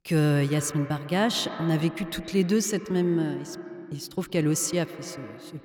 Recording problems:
echo of what is said; noticeable; throughout; 120 ms later, 15 dB below the speech

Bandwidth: 17.5 kHz